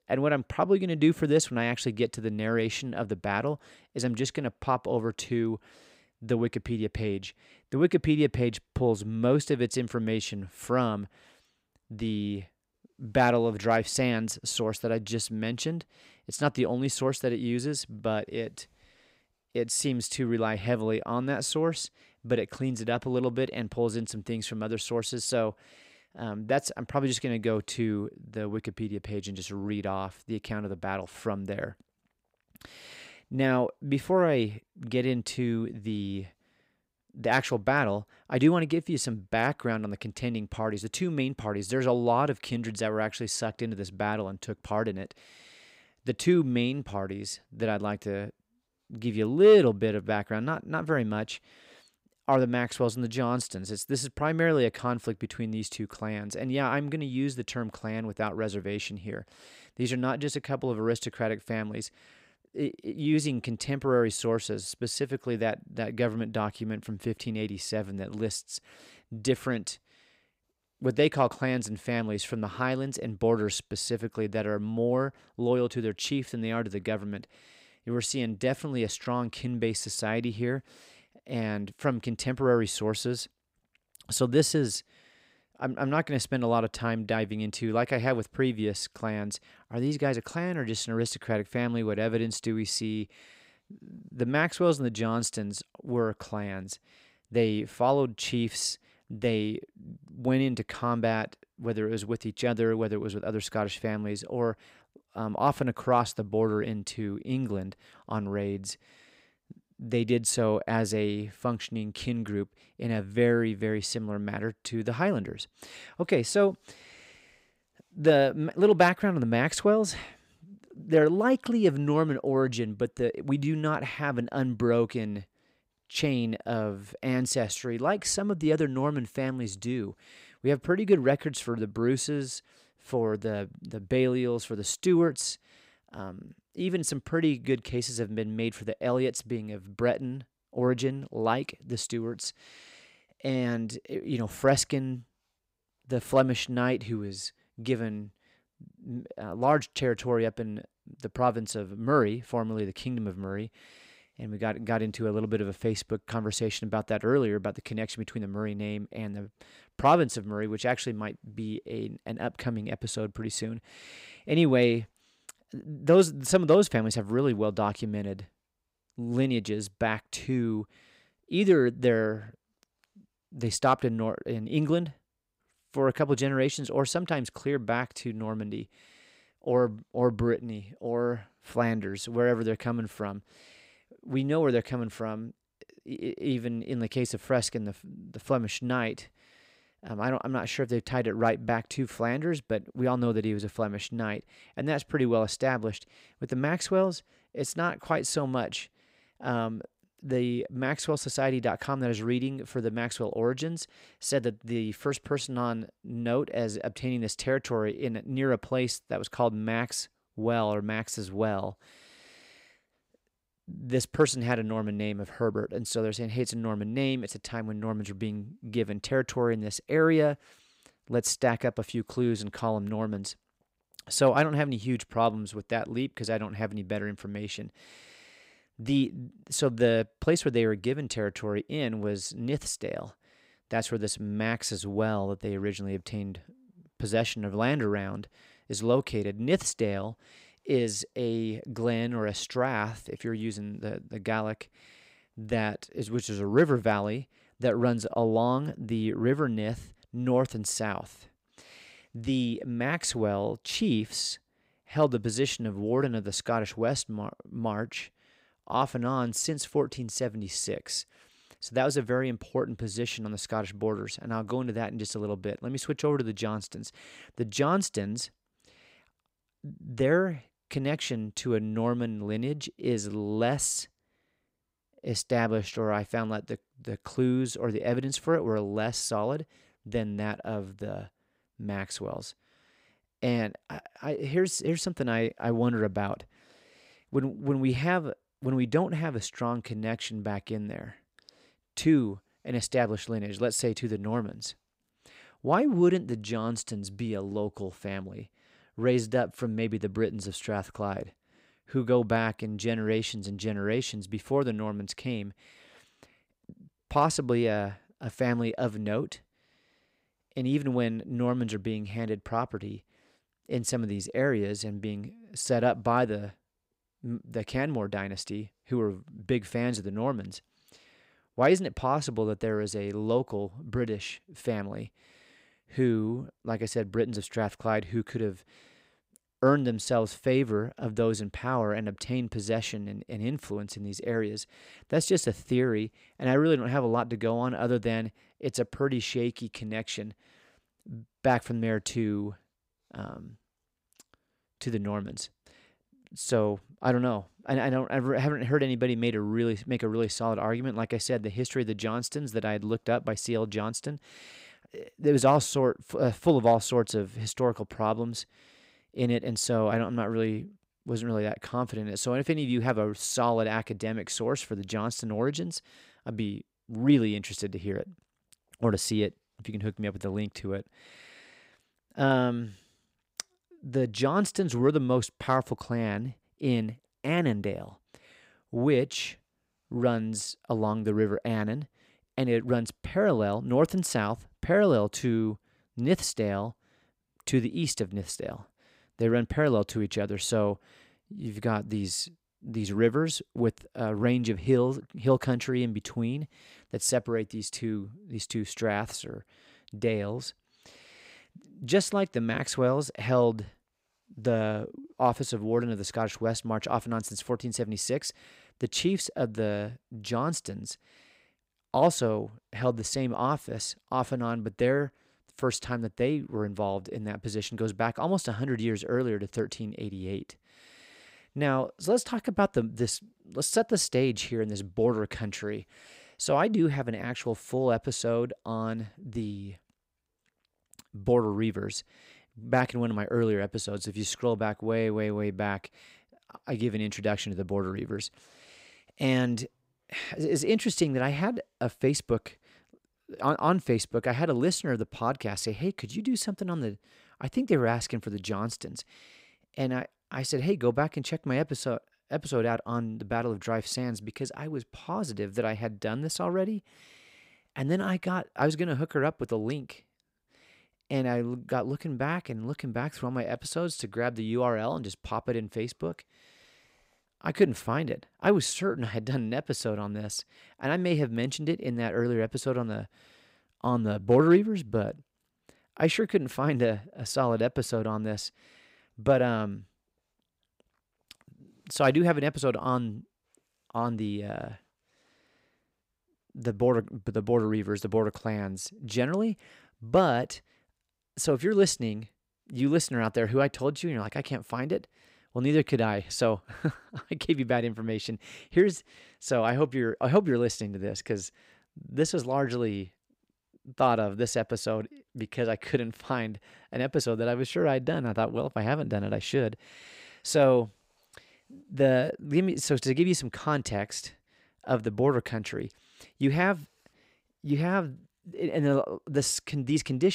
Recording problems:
abrupt cut into speech; at the end

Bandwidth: 15.5 kHz